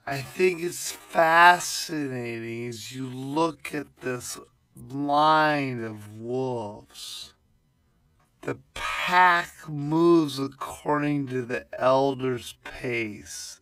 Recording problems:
wrong speed, natural pitch; too slow; 0.5 times normal speed

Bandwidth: 15.5 kHz